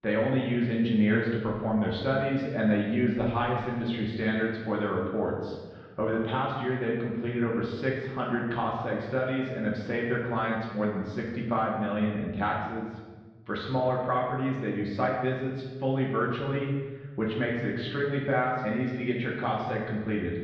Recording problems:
off-mic speech; far
muffled; very; fading above 3.5 kHz
room echo; noticeable; dies away in 1.1 s

